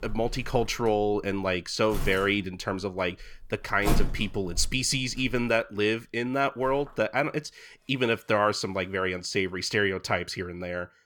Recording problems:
household noises; loud; throughout; 10 dB below the speech

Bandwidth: 18 kHz